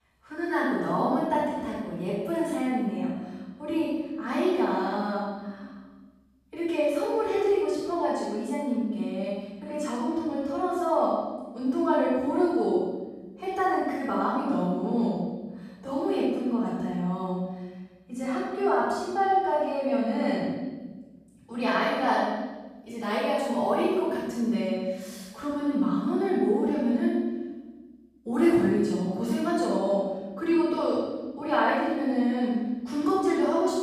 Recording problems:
room echo; strong; dies away in 1.3 s
off-mic speech; far

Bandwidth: 14.5 kHz